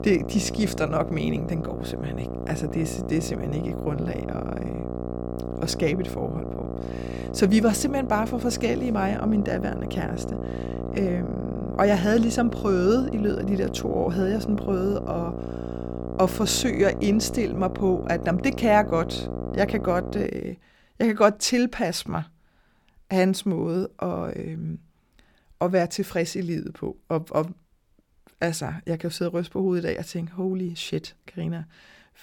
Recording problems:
electrical hum; loud; until 20 s; 60 Hz, 9 dB below the speech

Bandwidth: 18 kHz